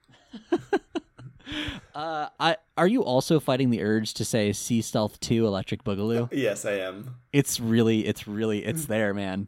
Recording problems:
none

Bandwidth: 16 kHz